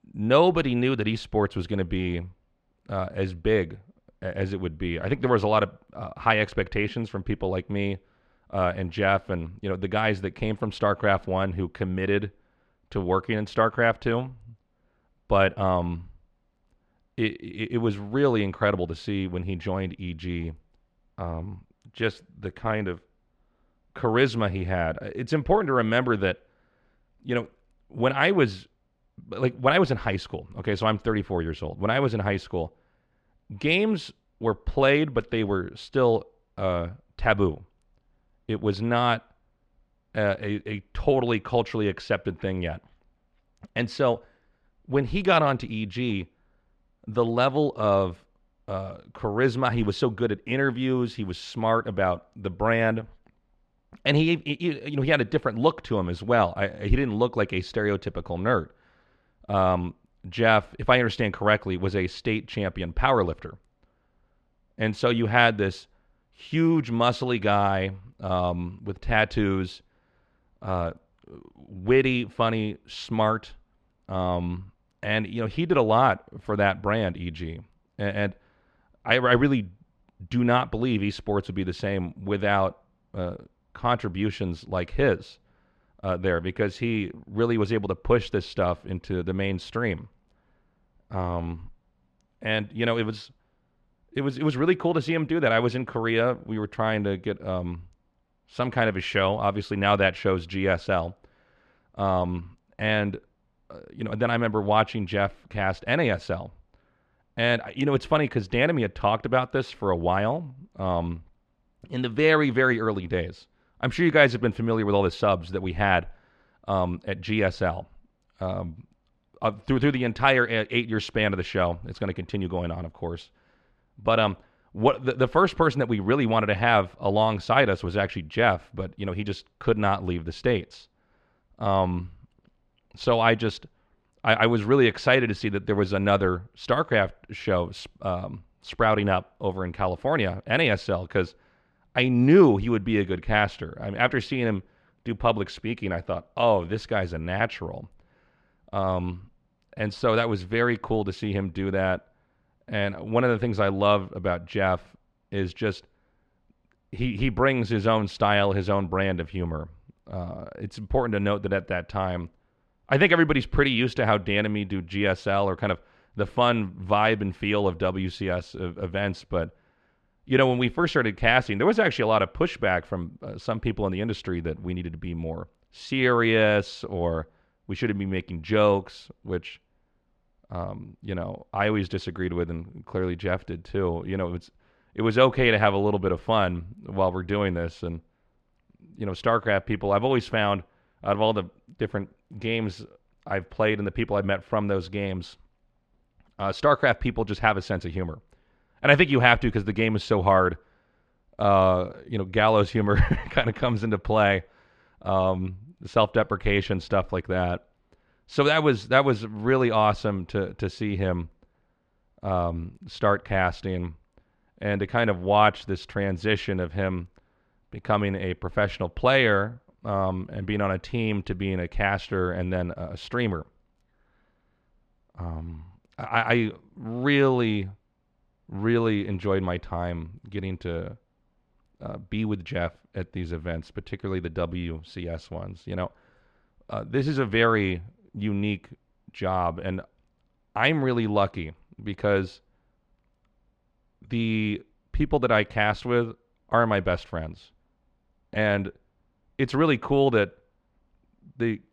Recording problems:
muffled; slightly; fading above 3 kHz

